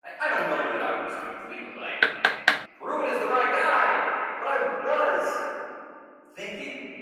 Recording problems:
echo of what is said; strong; throughout; 340 ms later, 8 dB below the speech
room echo; strong; dies away in 2.4 s
off-mic speech; far
thin; somewhat; fading below 450 Hz
garbled, watery; slightly; nothing above 17.5 kHz
door banging; loud; at 2 s; peak 5 dB above the speech

